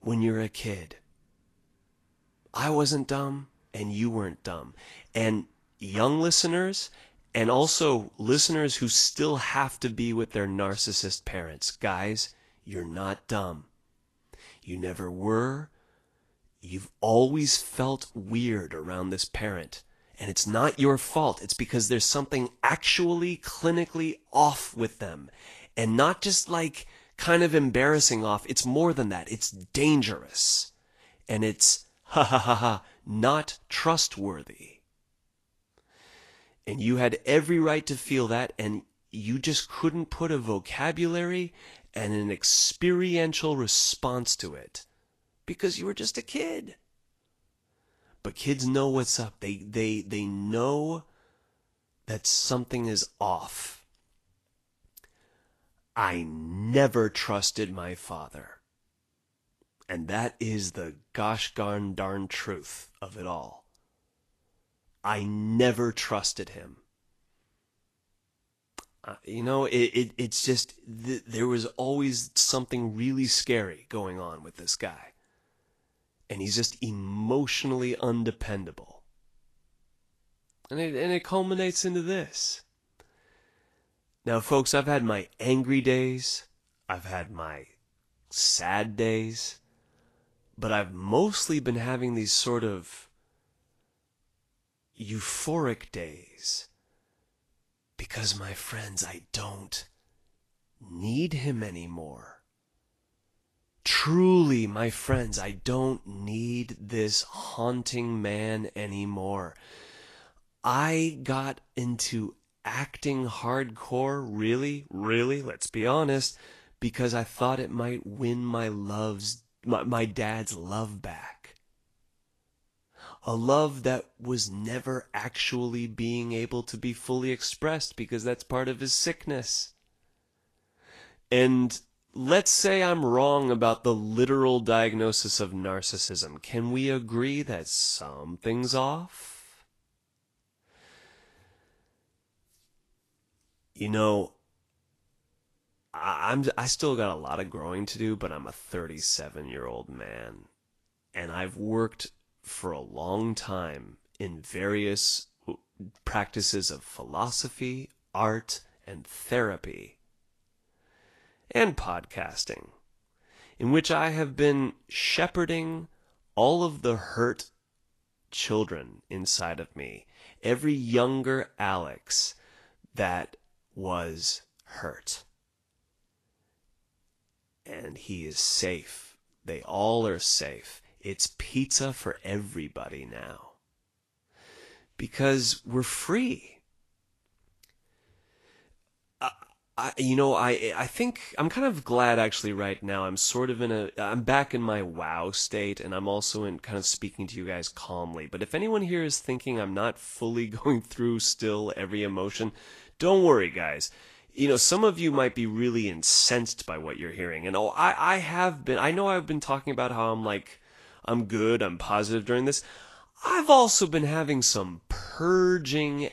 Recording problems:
garbled, watery; slightly; nothing above 12.5 kHz

